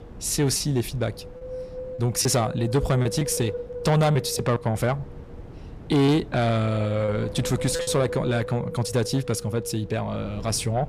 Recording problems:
distortion; slight; 10 dB below the speech
wind noise on the microphone; heavy; 9 dB below the speech
choppy; very; from 0.5 to 2.5 s, from 3 to 4.5 s and from 6 to 8 s; 5% of the speech affected

